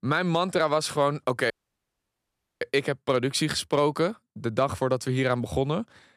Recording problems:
audio cutting out; at 1.5 s for 1 s

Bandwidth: 14 kHz